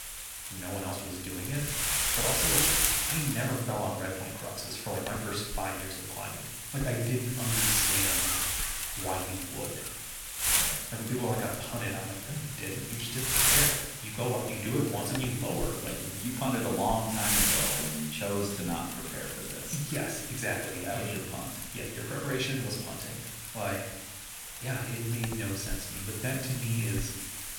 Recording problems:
room echo; noticeable; dies away in 0.8 s
off-mic speech; somewhat distant
wind noise on the microphone; heavy; 3 dB above the speech

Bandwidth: 18 kHz